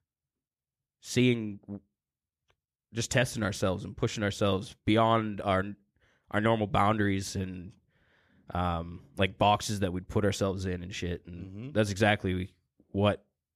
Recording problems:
none

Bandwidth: 14 kHz